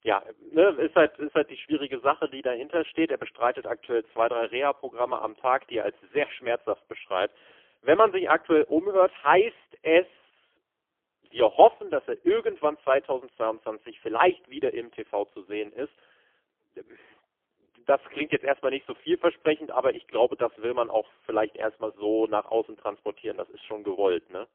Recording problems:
phone-call audio; poor line; nothing above 3.5 kHz

